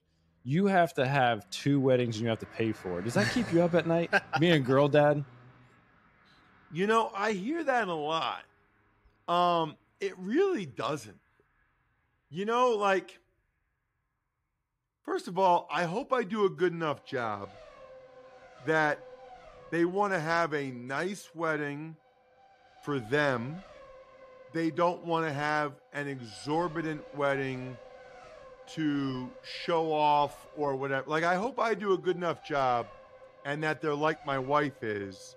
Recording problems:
traffic noise; faint; throughout; 20 dB below the speech

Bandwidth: 14.5 kHz